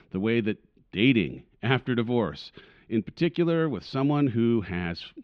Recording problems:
muffled; slightly; fading above 3 kHz

